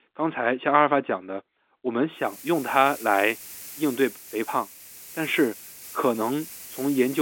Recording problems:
phone-call audio; nothing above 3.5 kHz
hiss; noticeable; from 2.5 s on; 15 dB below the speech
abrupt cut into speech; at the end

